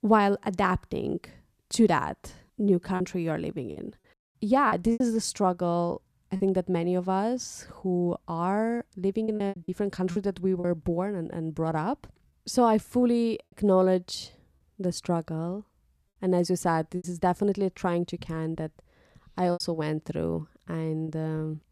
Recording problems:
choppy; occasionally; 5% of the speech affected

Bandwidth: 14.5 kHz